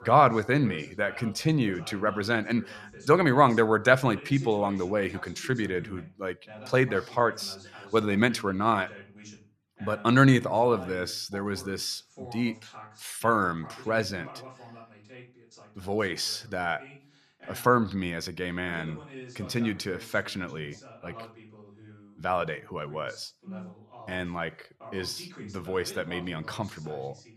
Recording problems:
voice in the background; noticeable; throughout; 20 dB below the speech

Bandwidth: 14 kHz